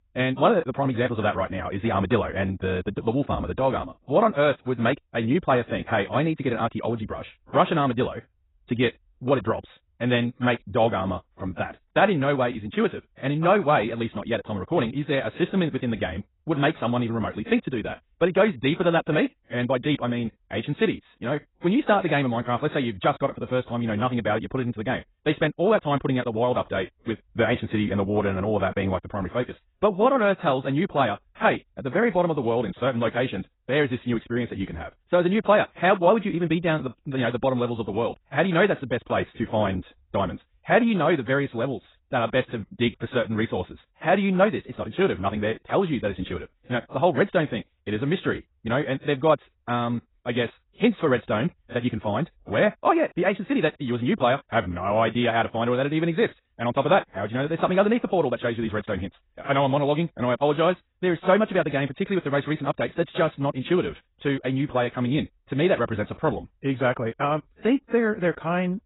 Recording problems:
garbled, watery; badly; nothing above 4 kHz
wrong speed, natural pitch; too fast; 1.6 times normal speed

